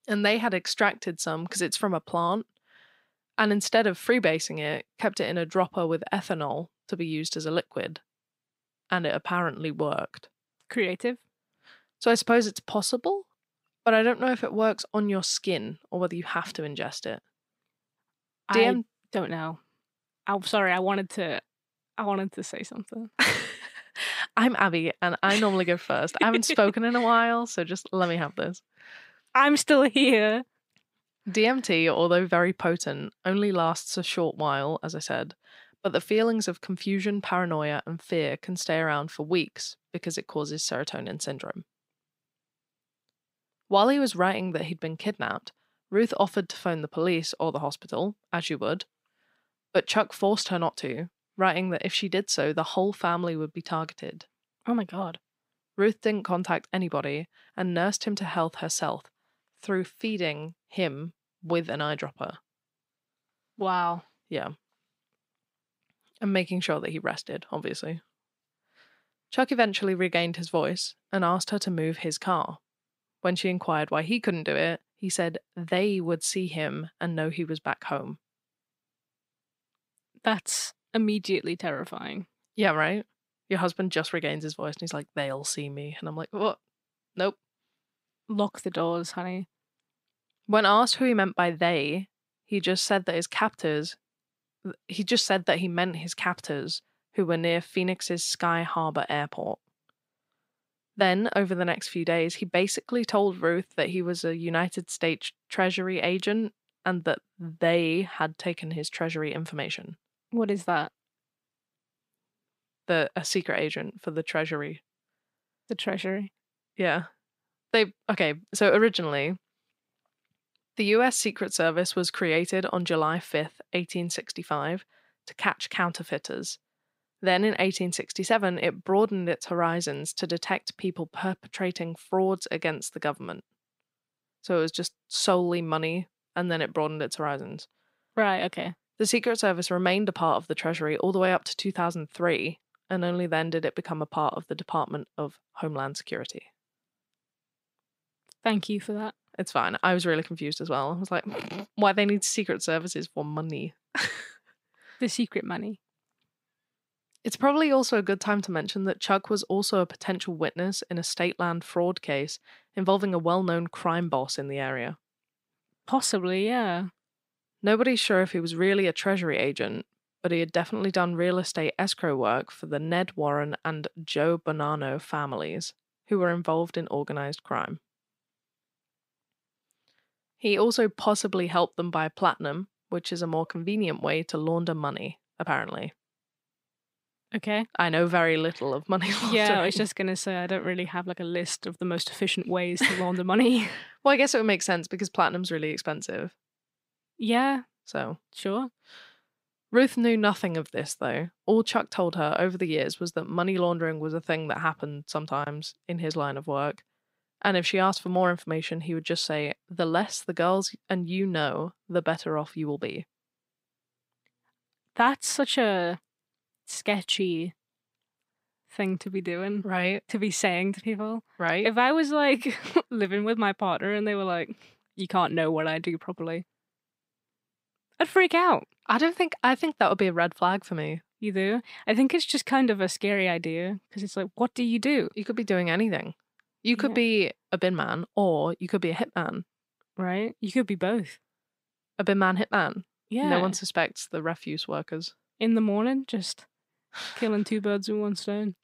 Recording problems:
none

